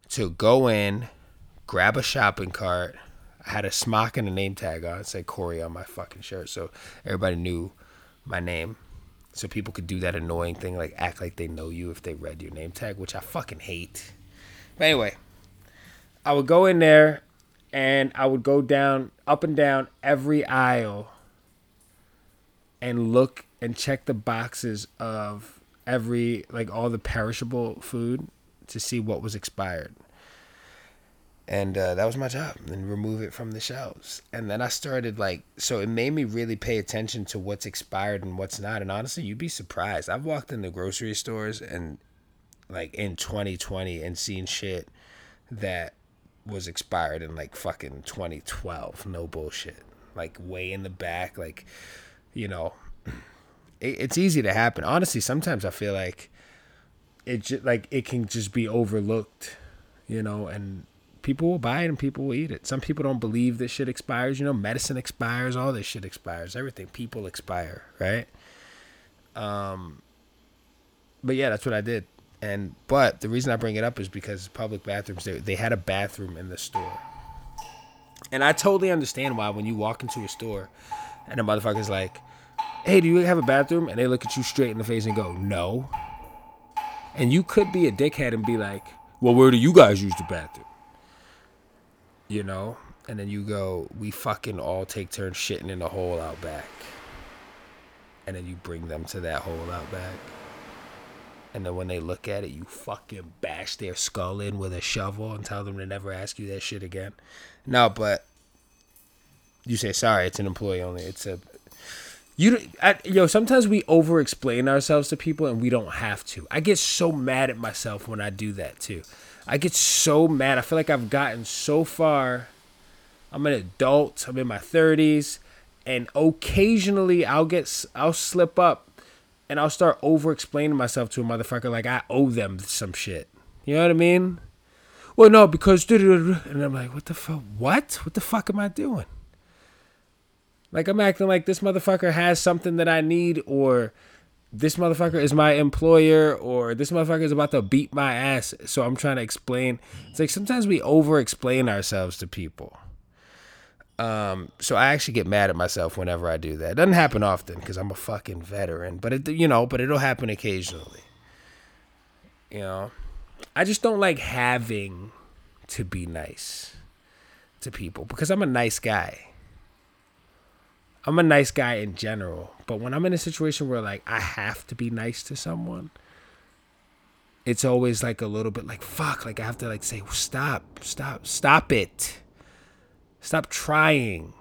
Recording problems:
rain or running water; faint; throughout; 20 dB below the speech

